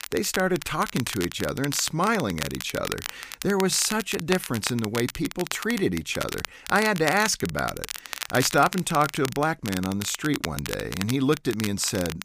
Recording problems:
crackle, like an old record; loud; 9 dB below the speech

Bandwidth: 15 kHz